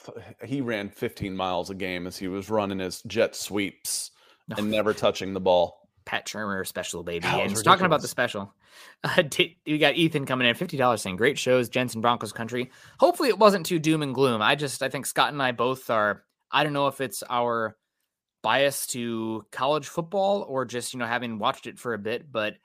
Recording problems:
none

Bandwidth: 15 kHz